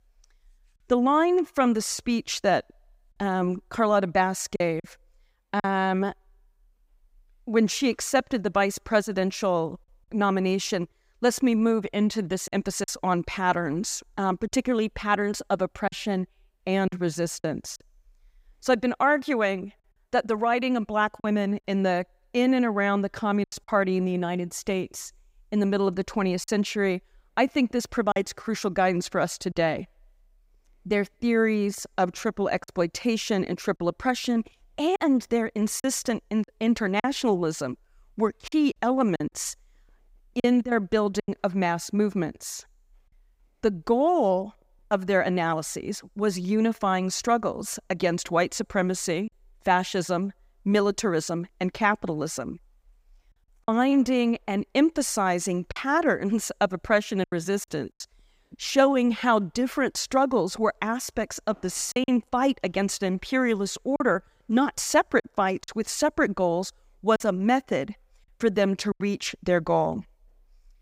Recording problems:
choppy; occasionally; 3% of the speech affected

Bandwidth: 15.5 kHz